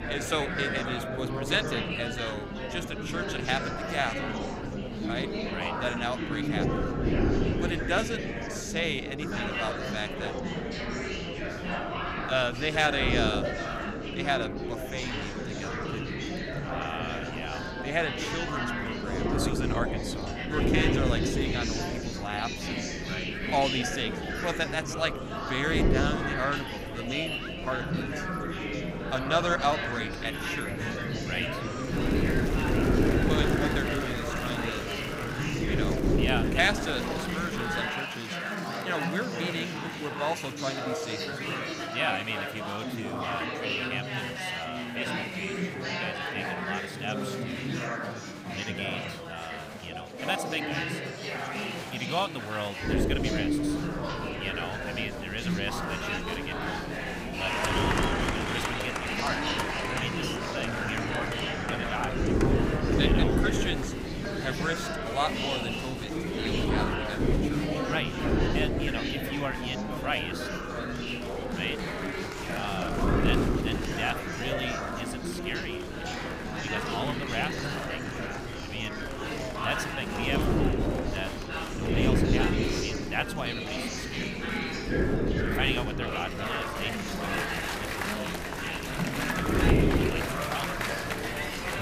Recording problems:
murmuring crowd; very loud; throughout; 1 dB above the speech
wind noise on the microphone; heavy; until 38 s and from 53 s on; 5 dB below the speech

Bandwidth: 15.5 kHz